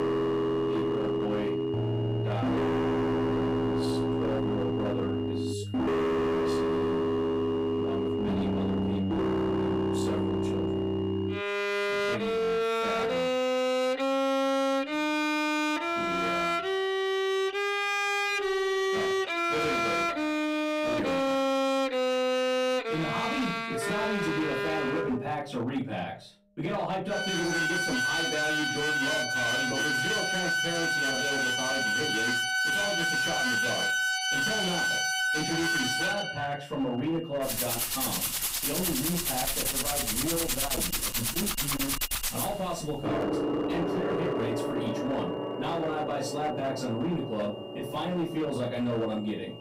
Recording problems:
distortion; heavy; 32% of the sound clipped
off-mic speech; far
room echo; slight; dies away in 0.3 s
background music; very loud; throughout; 5 dB above the speech
high-pitched whine; noticeable; until 20 s and from 29 s on; 3 kHz, 15 dB below the speech

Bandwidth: 15.5 kHz